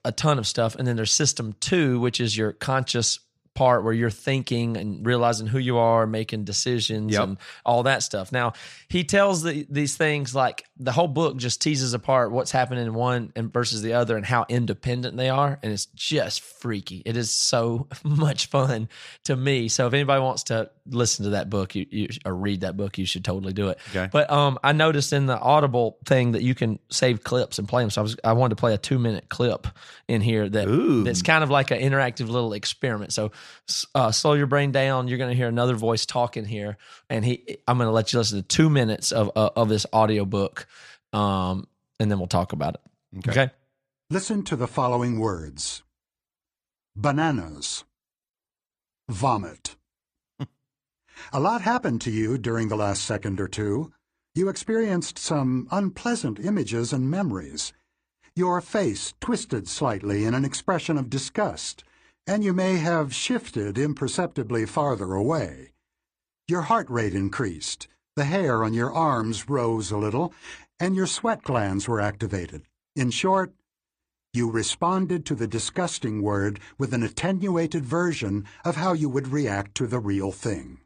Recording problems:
none

